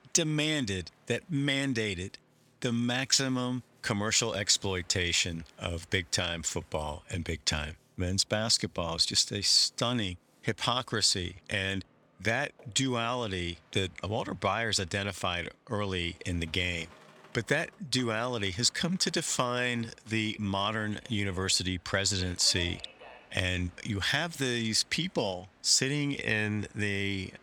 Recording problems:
train or aircraft noise; faint; throughout; 30 dB below the speech

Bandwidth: 18.5 kHz